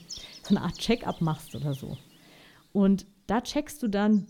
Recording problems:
animal sounds; noticeable; throughout; 15 dB below the speech

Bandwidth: 17.5 kHz